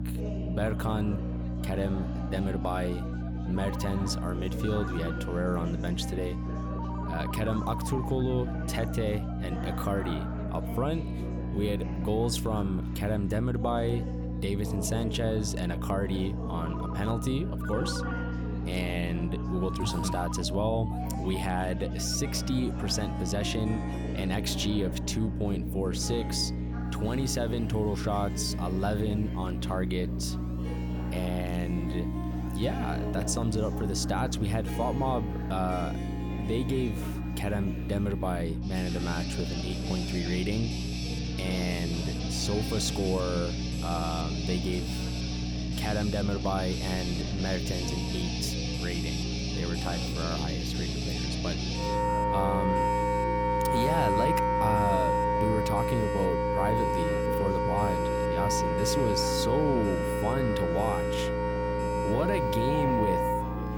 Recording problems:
background music; very loud; throughout; as loud as the speech
electrical hum; loud; throughout; 60 Hz, 9 dB below the speech
alarms or sirens; noticeable; throughout; 15 dB below the speech
background chatter; noticeable; throughout; 4 voices, 10 dB below the speech

